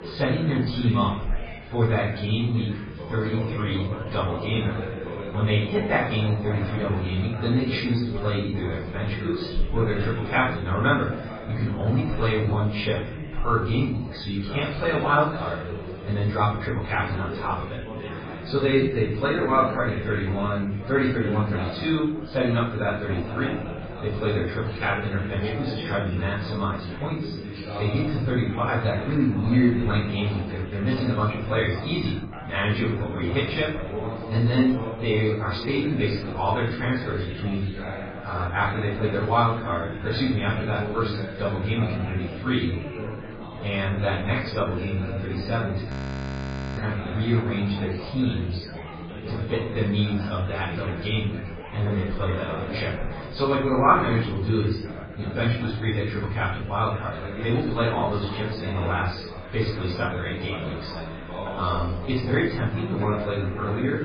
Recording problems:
off-mic speech; far
garbled, watery; badly; nothing above 6.5 kHz
room echo; noticeable; dies away in 0.5 s
background chatter; loud; throughout; 4 voices, 9 dB below the speech
audio freezing; at 46 s for 1 s

